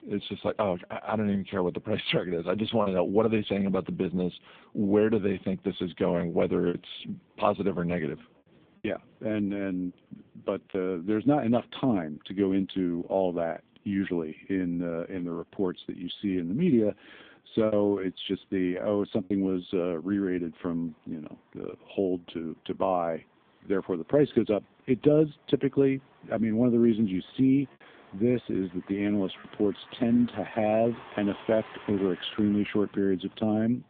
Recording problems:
phone-call audio; poor line; nothing above 3.5 kHz
traffic noise; faint; throughout; 25 dB below the speech
choppy; occasionally; 2% of the speech affected

